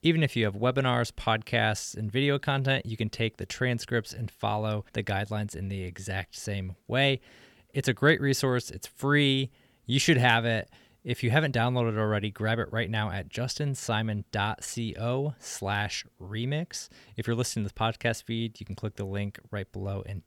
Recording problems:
none

